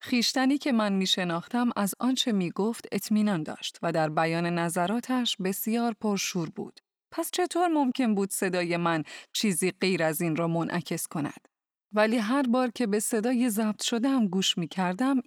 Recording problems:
none

